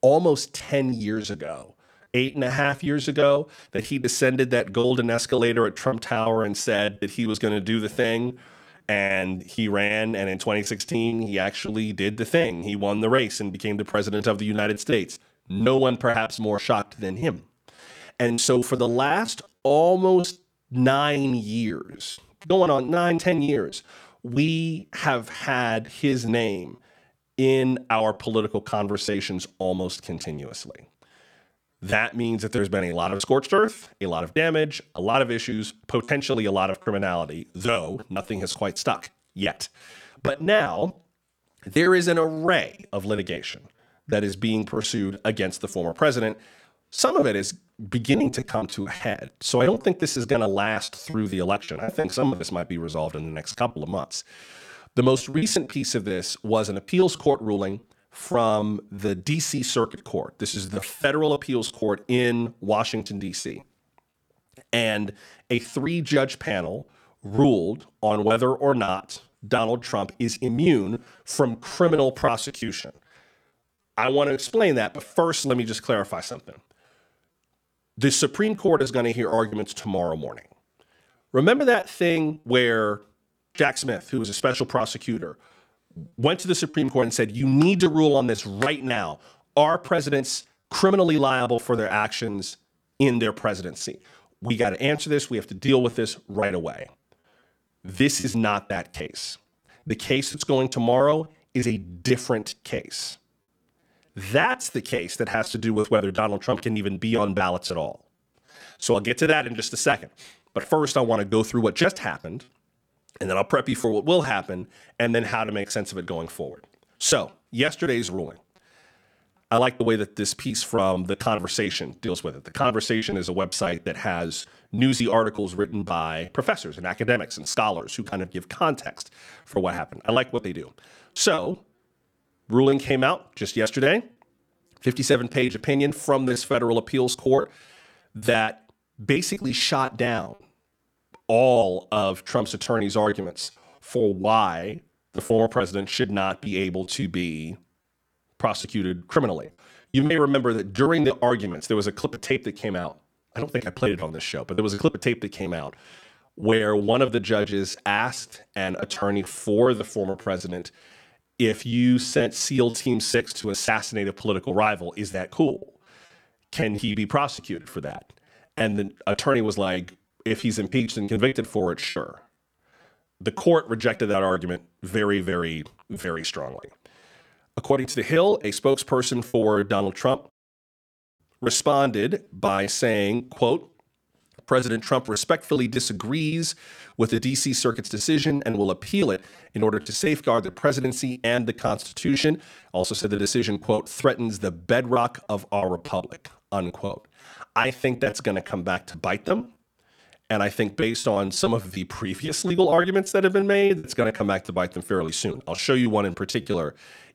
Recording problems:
choppy; very; 16% of the speech affected

